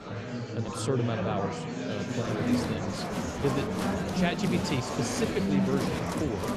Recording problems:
murmuring crowd; very loud; throughout; 2 dB above the speech

